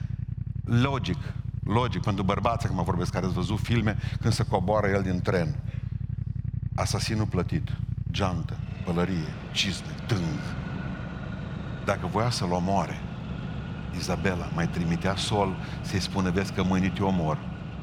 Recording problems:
traffic noise; loud; throughout; 6 dB below the speech

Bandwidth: 17 kHz